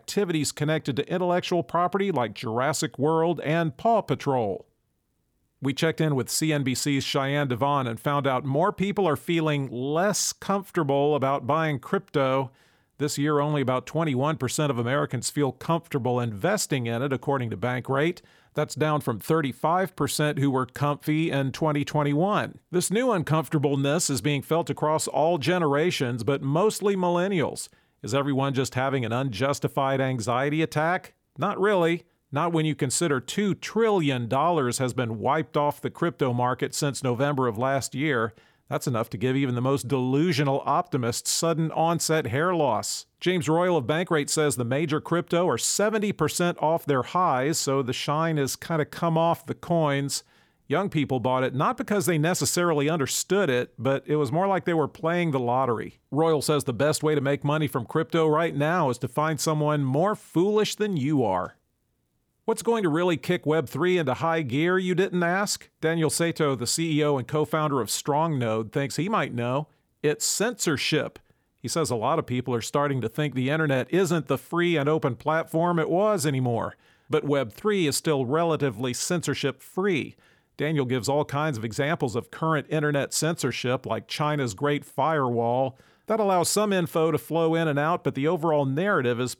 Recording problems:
none

